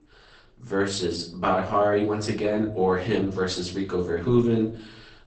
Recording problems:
off-mic speech; far
garbled, watery; badly; nothing above 8 kHz
echo of what is said; faint; throughout; 130 ms later, 20 dB below the speech
room echo; slight; dies away in 0.5 s

